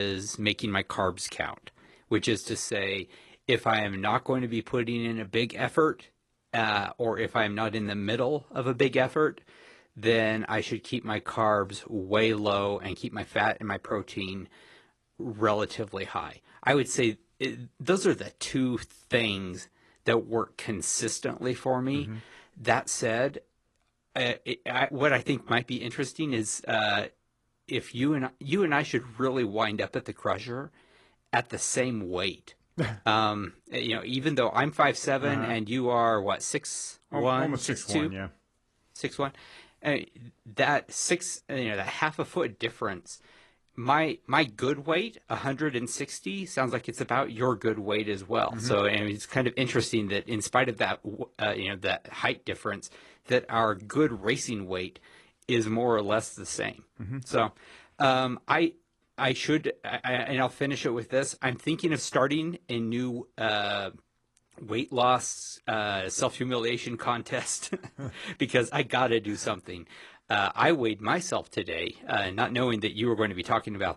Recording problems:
garbled, watery; slightly
abrupt cut into speech; at the start

